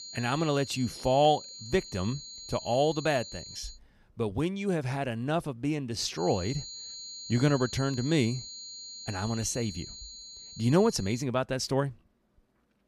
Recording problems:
high-pitched whine; noticeable; until 3.5 s and from 6 to 11 s; 4 kHz, 10 dB below the speech

